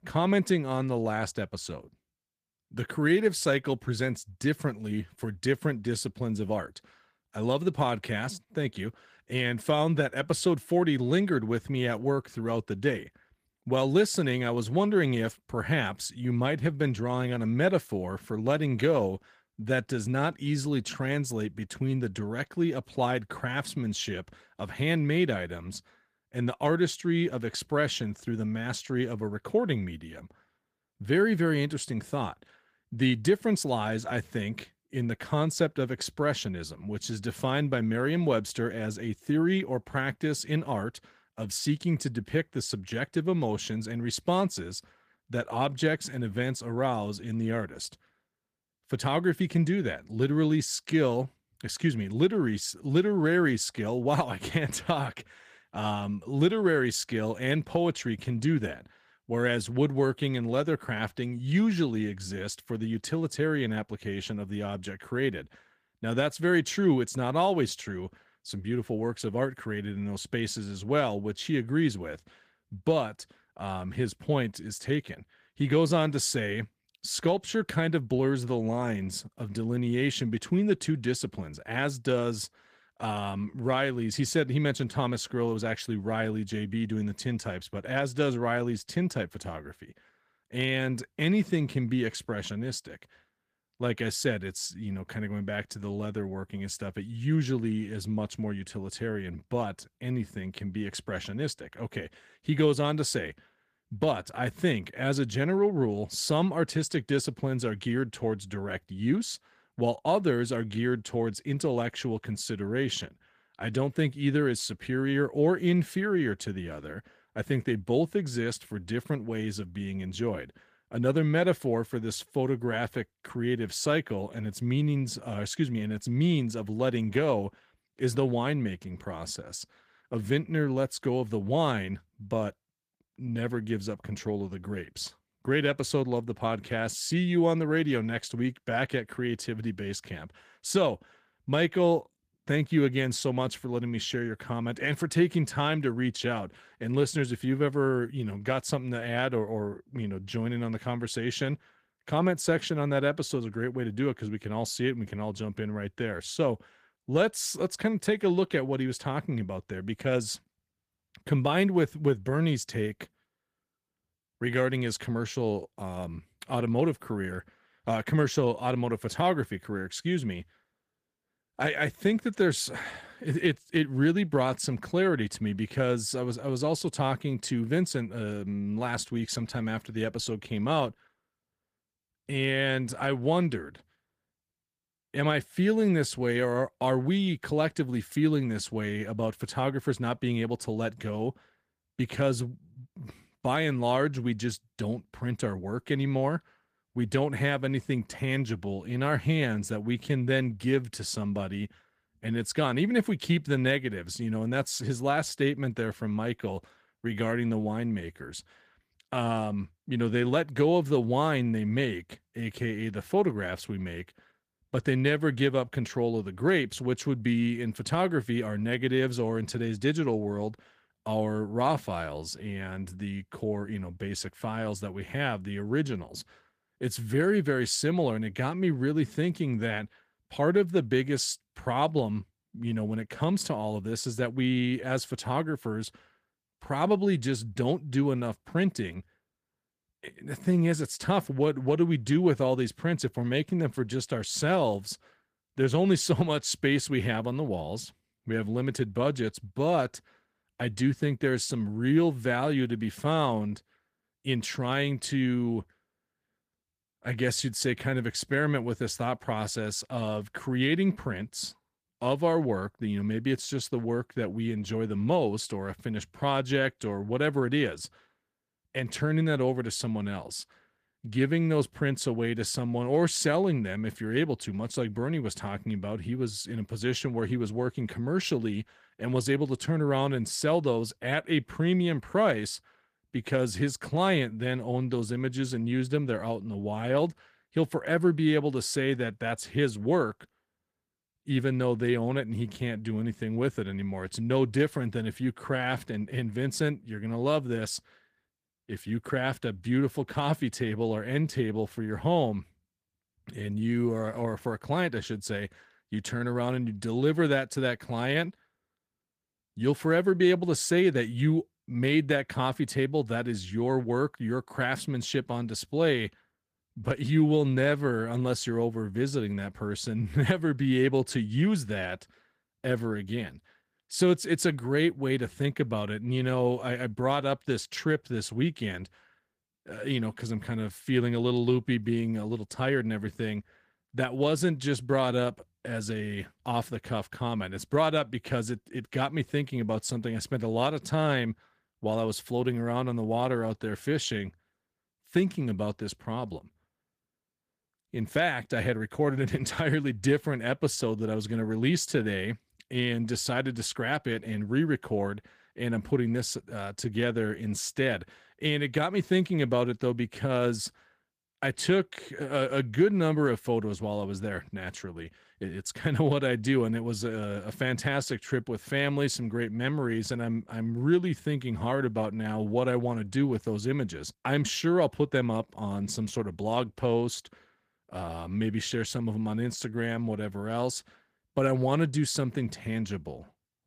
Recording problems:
garbled, watery; slightly; nothing above 15 kHz

